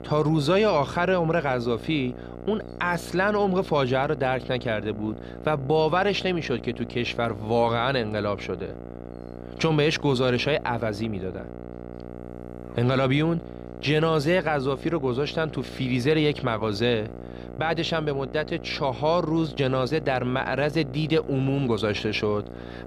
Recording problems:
electrical hum; noticeable; throughout; 60 Hz, 15 dB below the speech

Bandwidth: 15 kHz